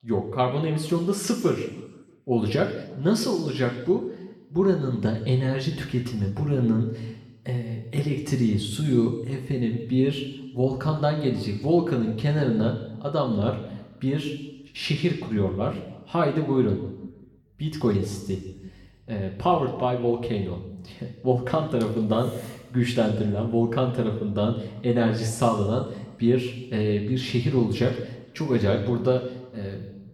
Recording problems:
room echo; slight; dies away in 1 s
off-mic speech; somewhat distant

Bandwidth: 18.5 kHz